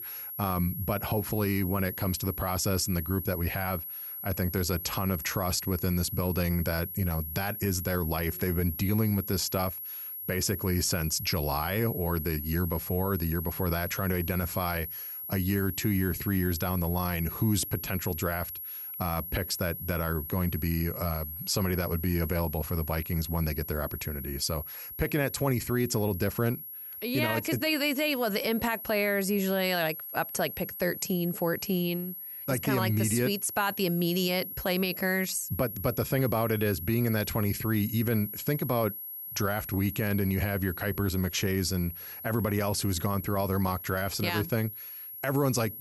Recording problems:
high-pitched whine; loud; throughout; 11.5 kHz, 7 dB below the speech

